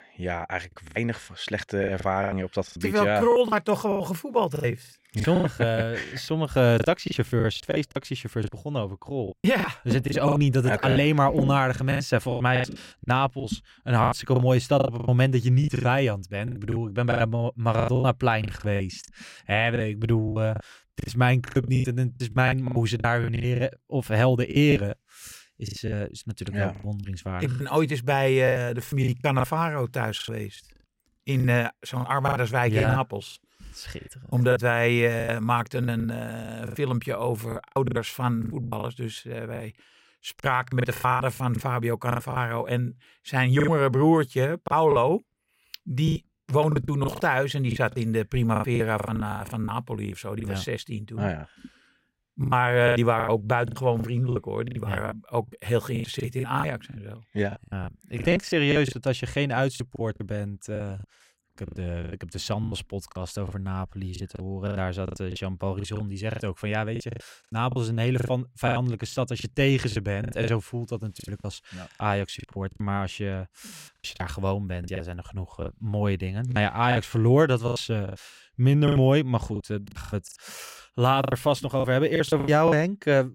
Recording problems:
choppy; very; 15% of the speech affected

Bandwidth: 16 kHz